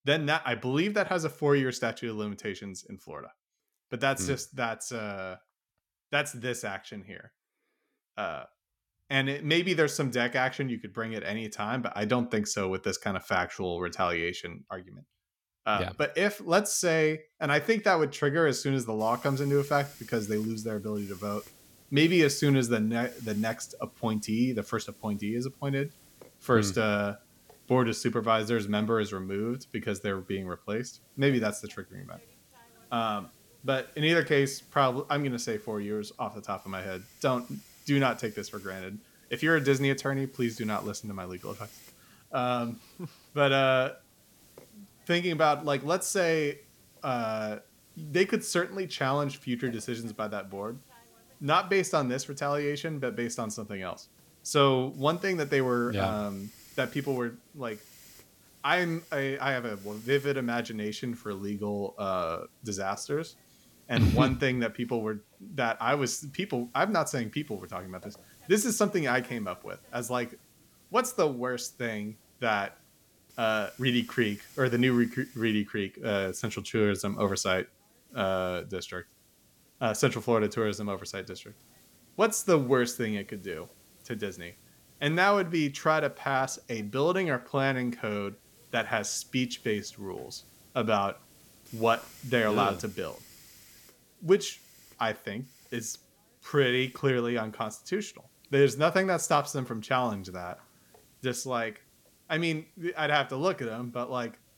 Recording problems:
hiss; faint; from 19 s on; 25 dB below the speech

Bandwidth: 17 kHz